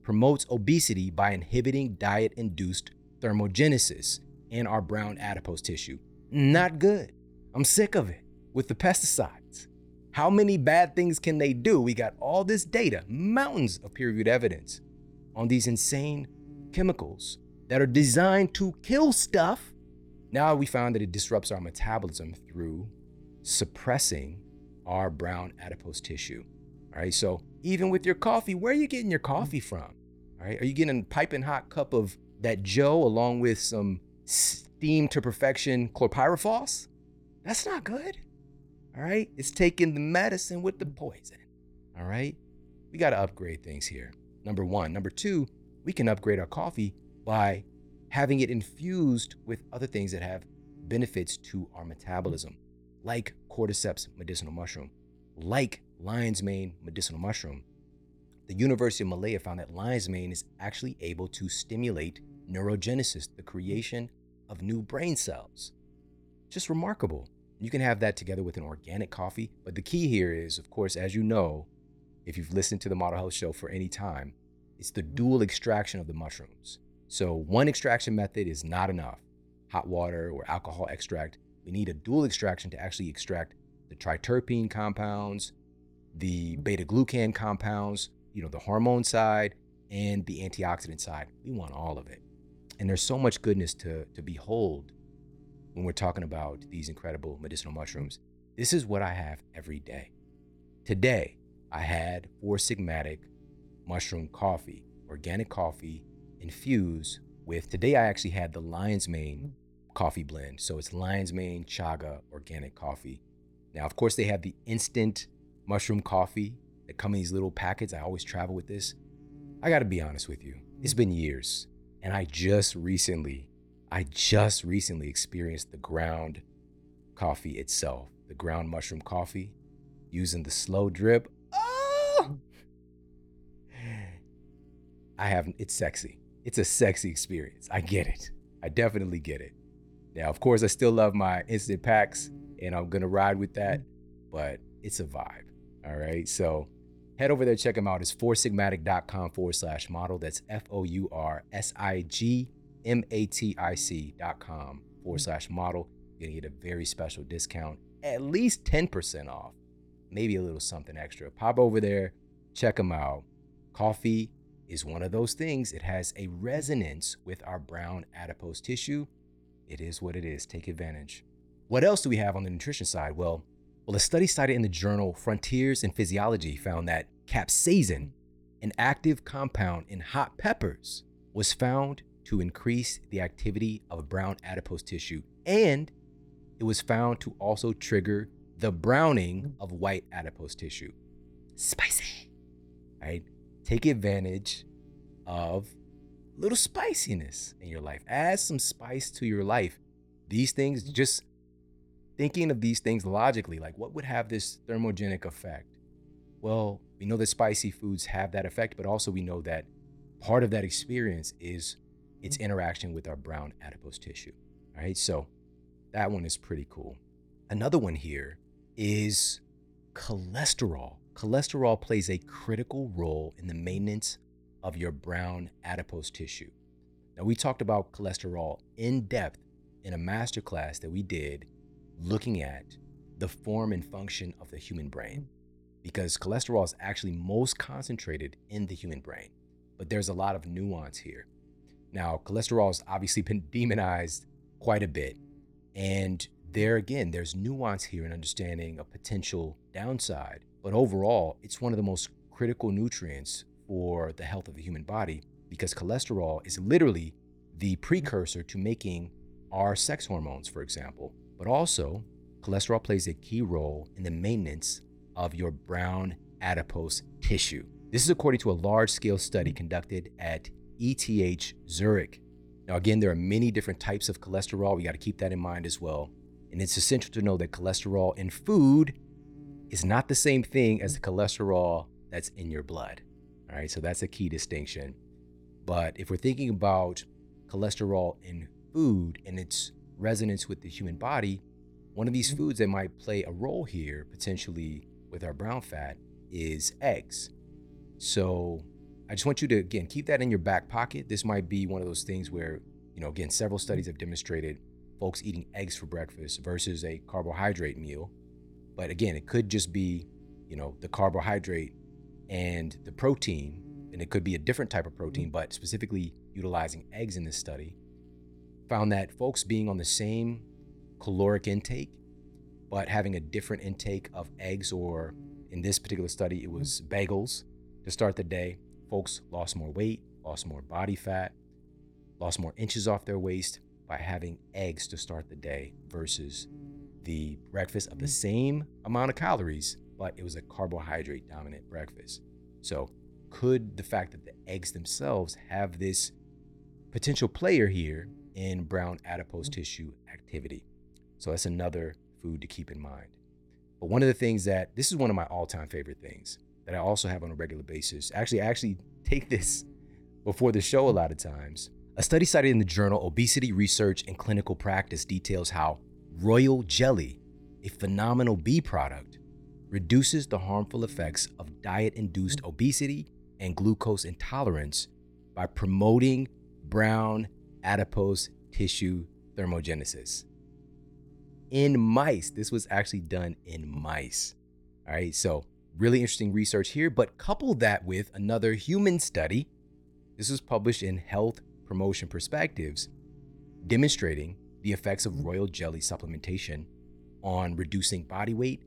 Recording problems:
electrical hum; faint; throughout; 60 Hz, 30 dB below the speech

